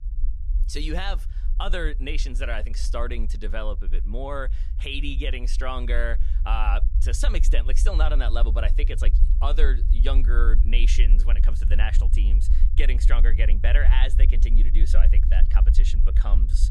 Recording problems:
low rumble; noticeable; throughout; 15 dB below the speech

